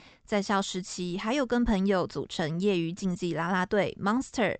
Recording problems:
high frequencies cut off; noticeable; nothing above 8 kHz

